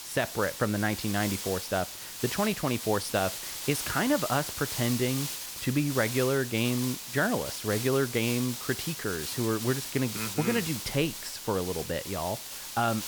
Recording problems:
hiss; loud; throughout; 5 dB below the speech

